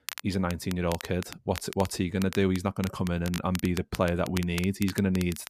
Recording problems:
crackle, like an old record; noticeable; 15 dB below the speech

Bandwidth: 14.5 kHz